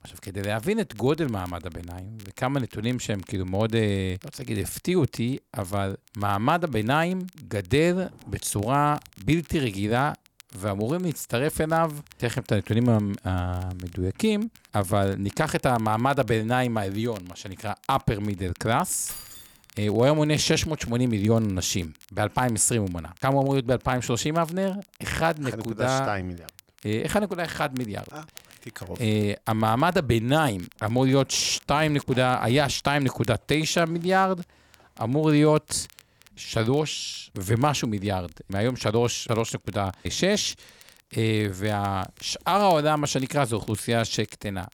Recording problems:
crackle, like an old record; faint; 25 dB below the speech
jangling keys; faint; at 19 s; peak 10 dB below the speech

